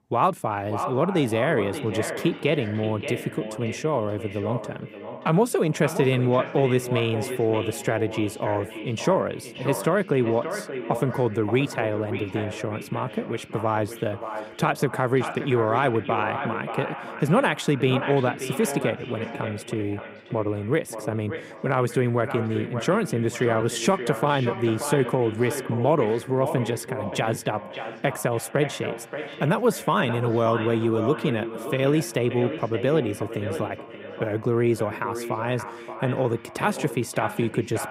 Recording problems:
echo of what is said; strong; throughout; 580 ms later, 9 dB below the speech

